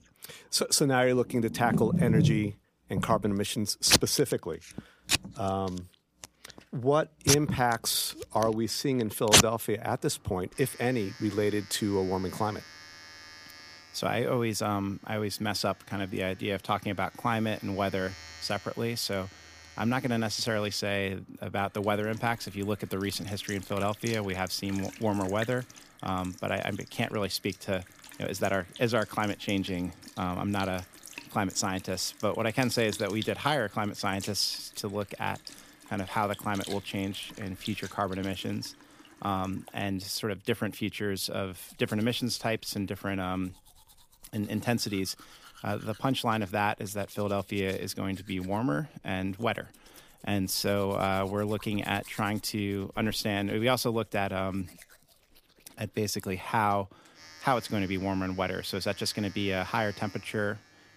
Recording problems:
household noises; loud; throughout; 2 dB below the speech

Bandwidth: 15 kHz